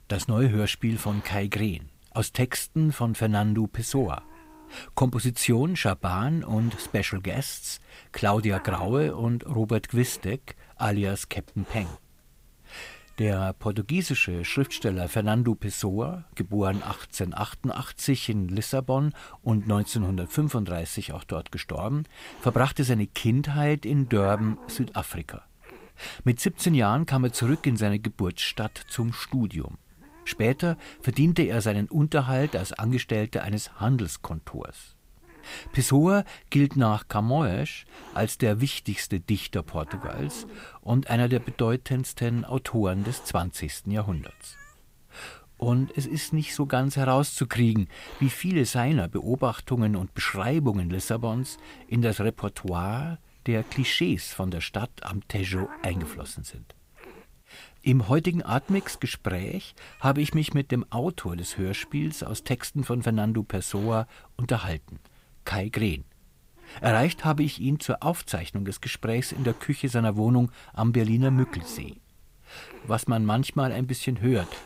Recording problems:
hiss; faint; throughout; 20 dB below the speech

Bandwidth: 15.5 kHz